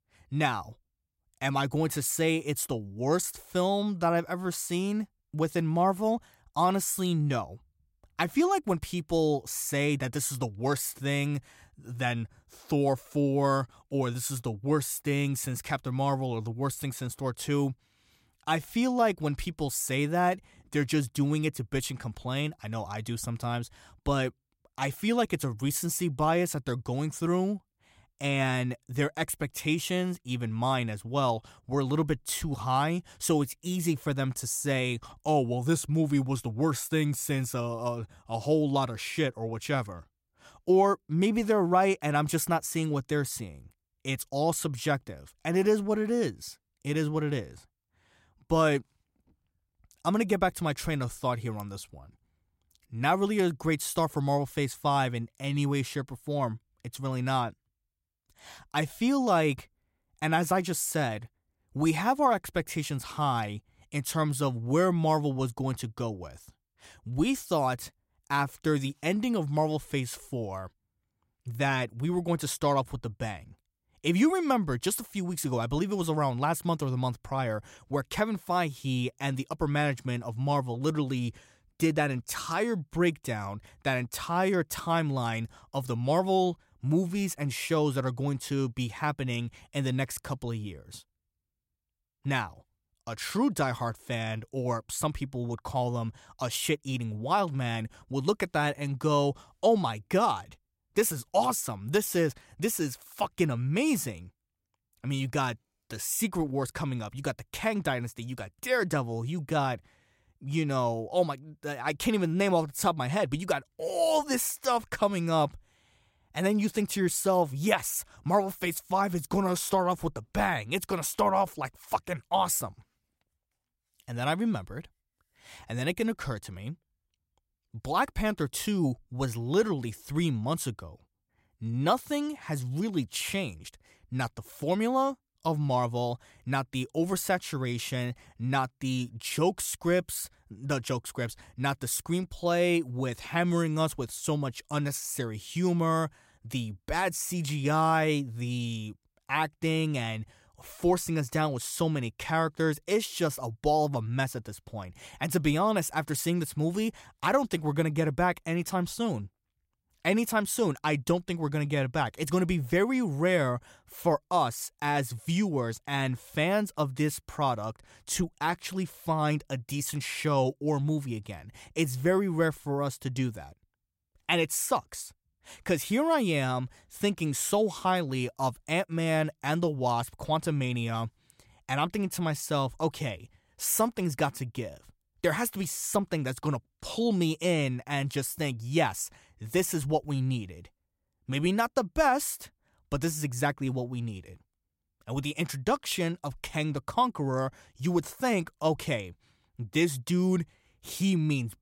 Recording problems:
none

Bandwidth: 16 kHz